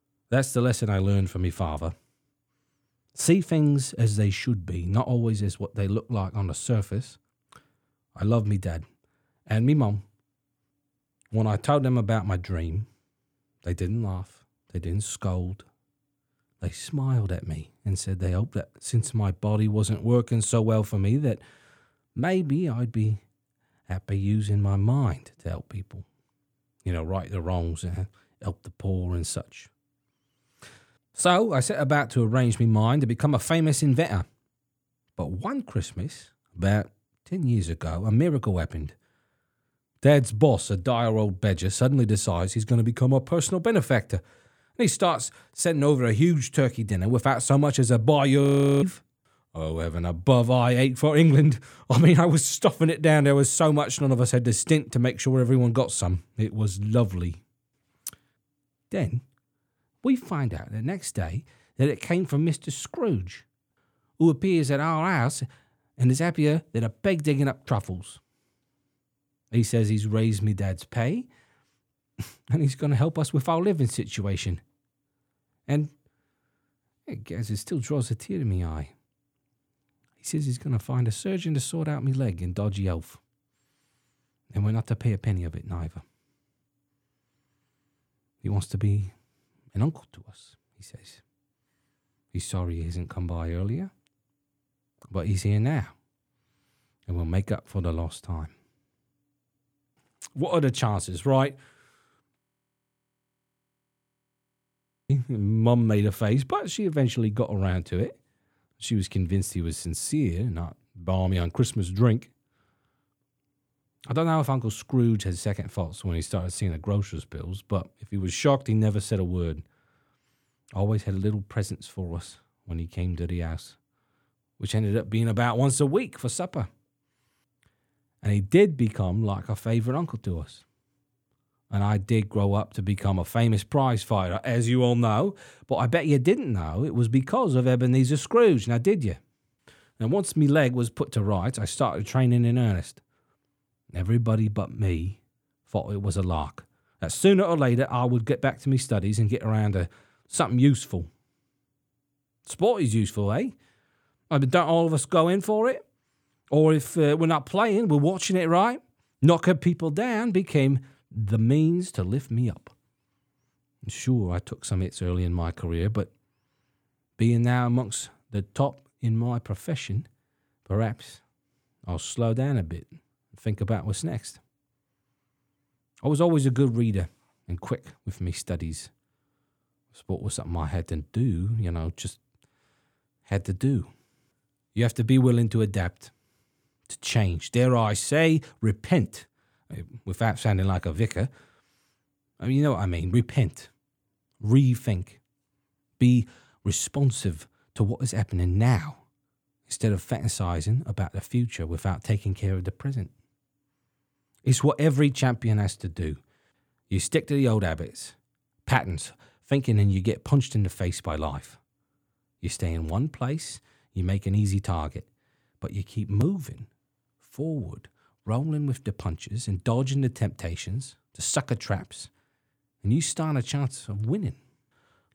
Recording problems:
audio freezing; at 48 s and at 1:42 for 2.5 s

